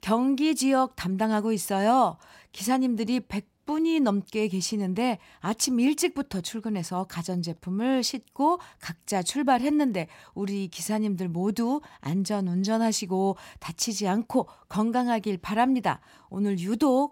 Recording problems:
none

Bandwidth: 16 kHz